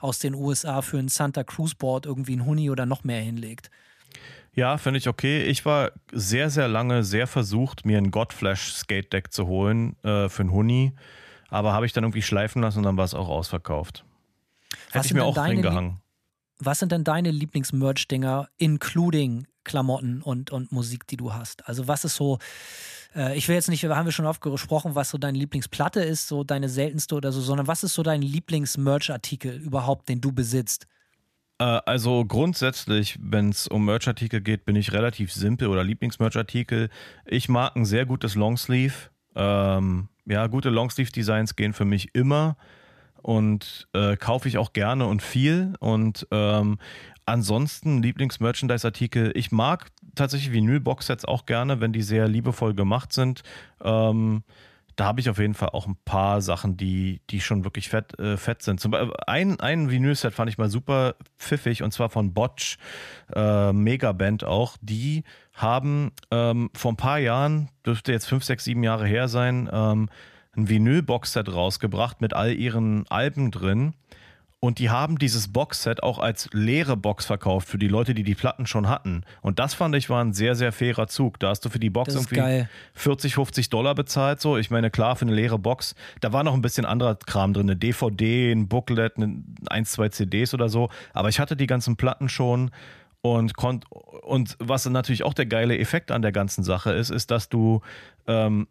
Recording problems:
none

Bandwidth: 14.5 kHz